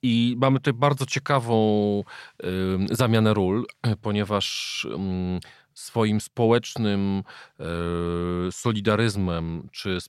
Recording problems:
none

